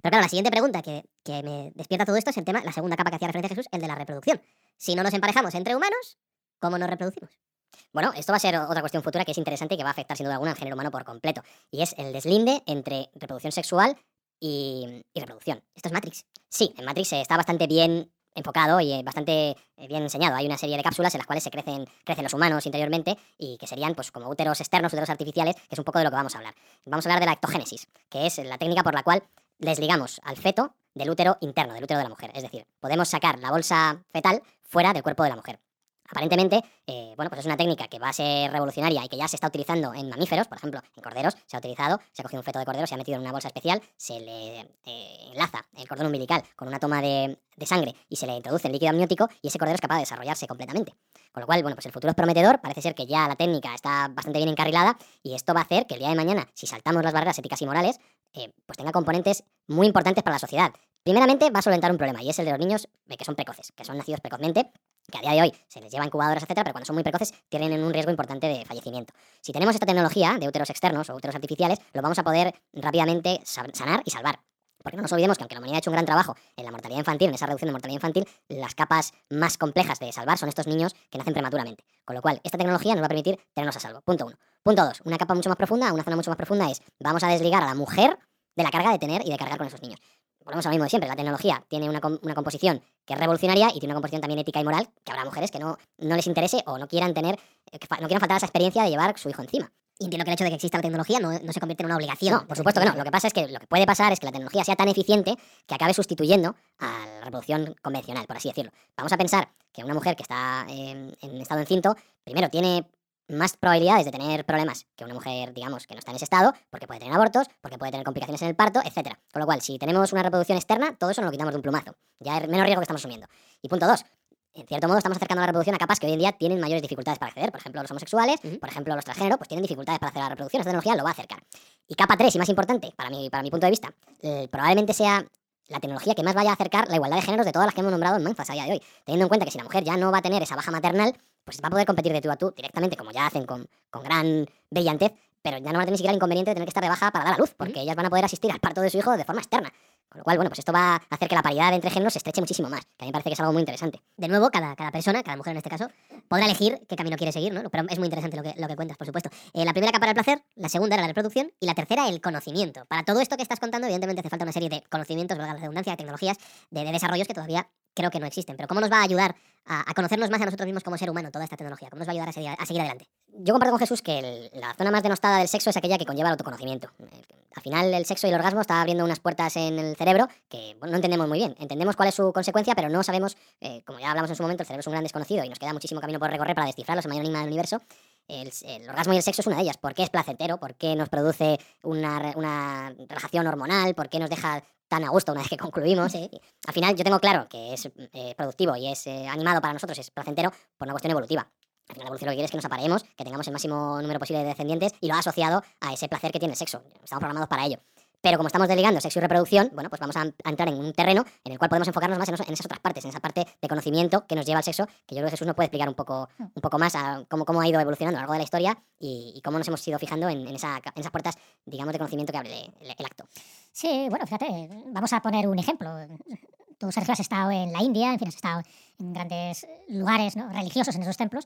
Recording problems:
wrong speed and pitch; too fast and too high; 1.5 times normal speed

